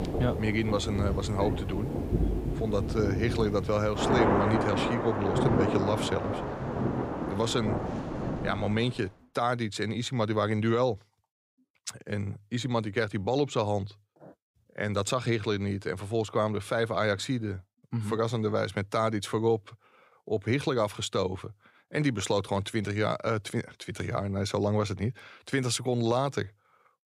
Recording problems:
rain or running water; loud; until 9 s; 1 dB below the speech

